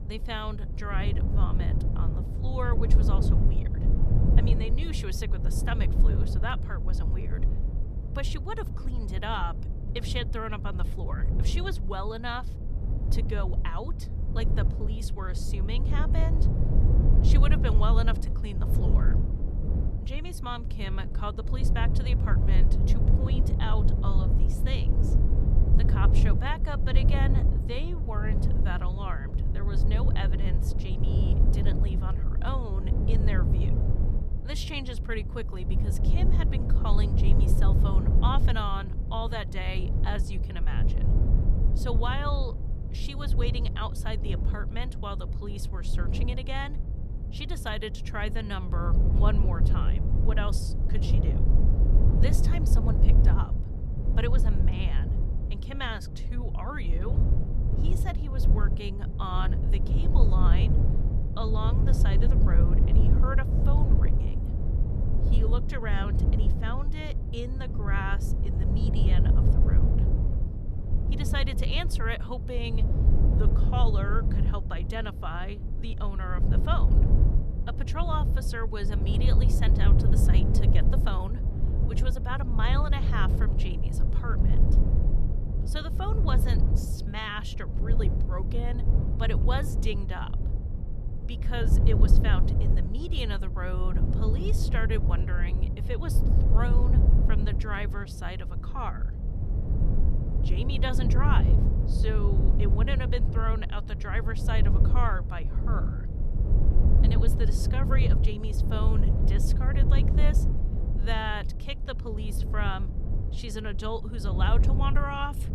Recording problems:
low rumble; loud; throughout; 5 dB below the speech

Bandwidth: 14 kHz